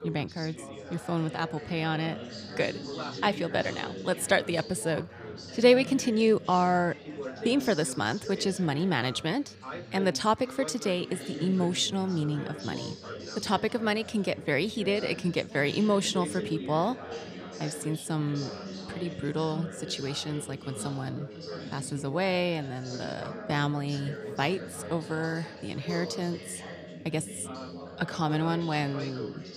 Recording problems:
background chatter; noticeable; throughout; 4 voices, 10 dB below the speech

